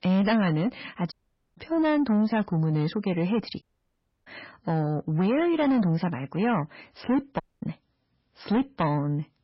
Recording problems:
garbled, watery; badly; nothing above 5.5 kHz
distortion; slight; 10 dB below the speech
audio cutting out; at 1 s, at 3.5 s for 0.5 s and at 7.5 s

